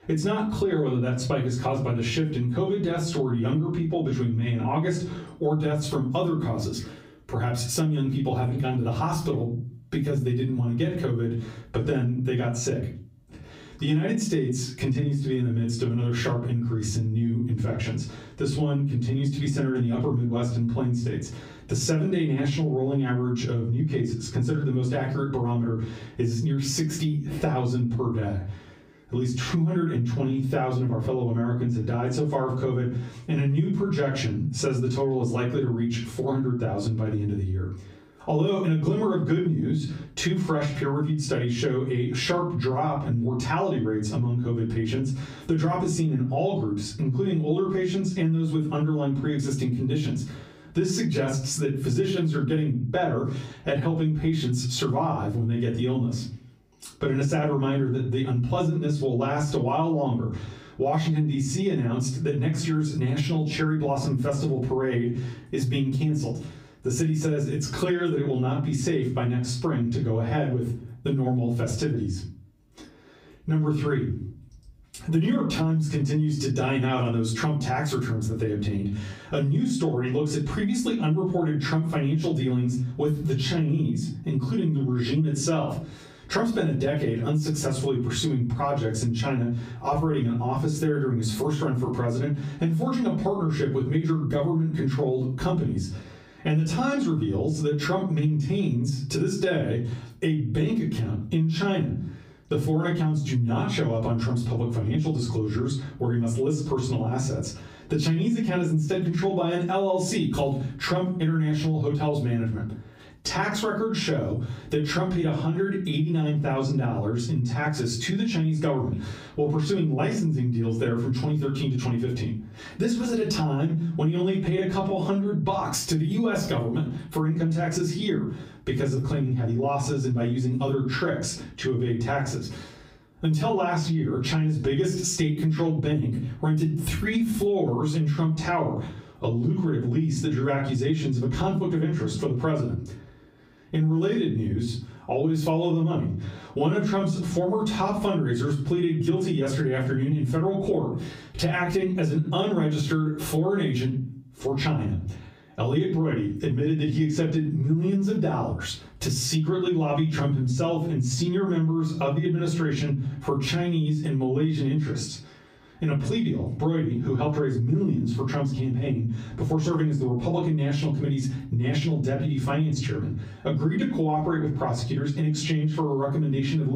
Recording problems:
off-mic speech; far
squashed, flat; heavily
room echo; slight; dies away in 0.3 s
abrupt cut into speech; at the end

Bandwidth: 15.5 kHz